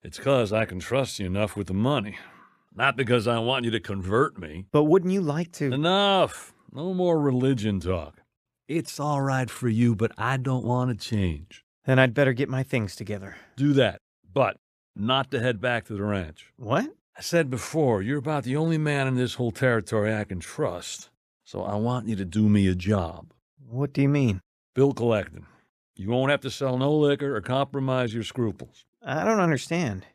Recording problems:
none

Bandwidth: 14.5 kHz